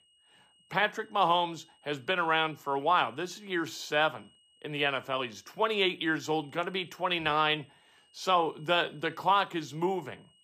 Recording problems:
high-pitched whine; faint; throughout; 3 kHz, 30 dB below the speech

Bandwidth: 15 kHz